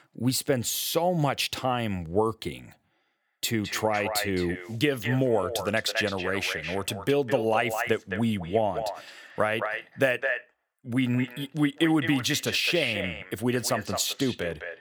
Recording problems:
echo of what is said; strong; from 3 s on; 210 ms later, 7 dB below the speech

